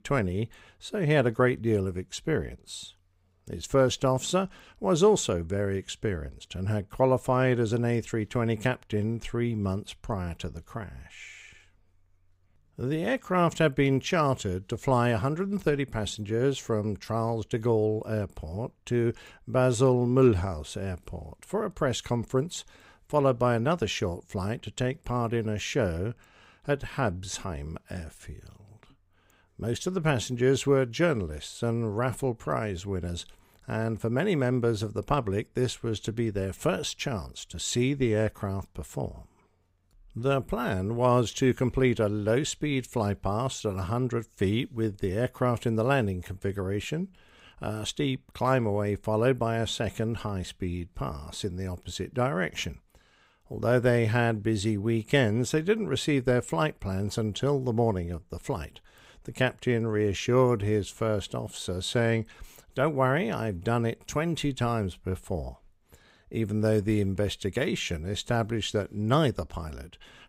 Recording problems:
none

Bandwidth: 15.5 kHz